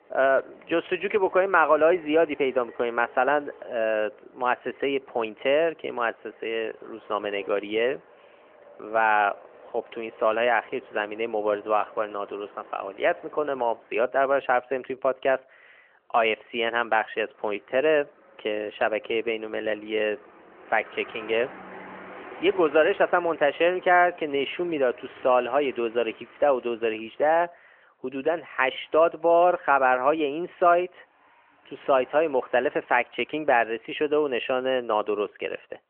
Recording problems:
phone-call audio; nothing above 3 kHz
traffic noise; faint; throughout; 25 dB below the speech

